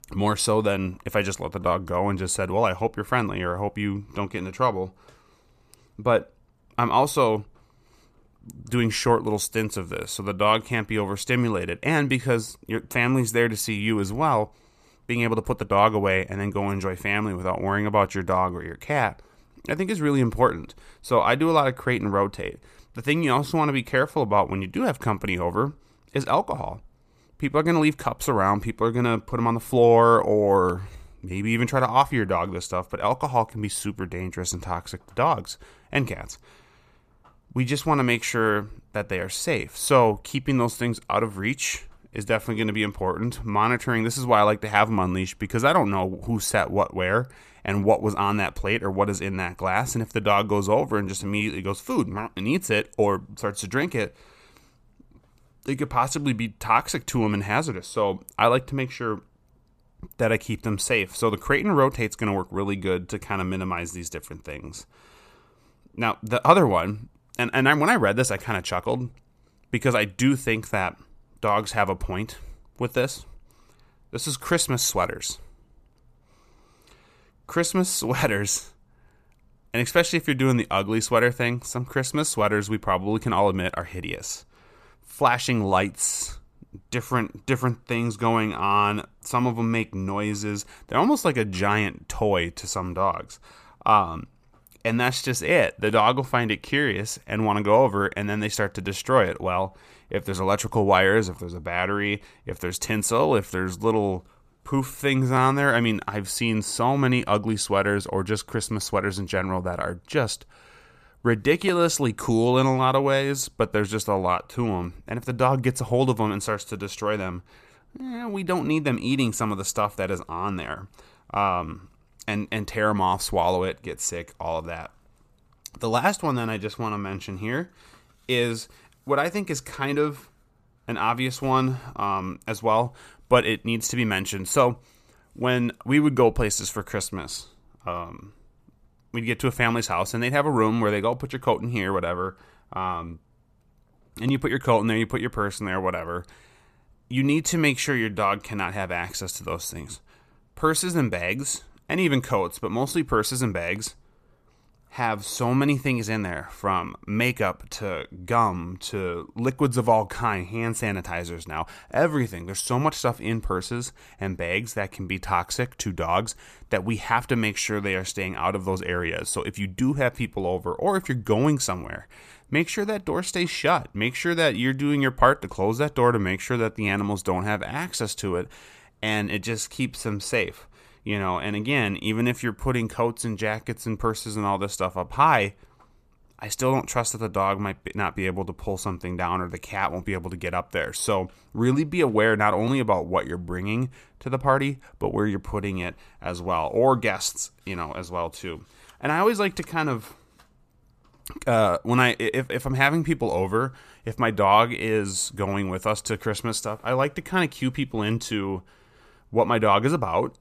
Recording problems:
none

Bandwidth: 14.5 kHz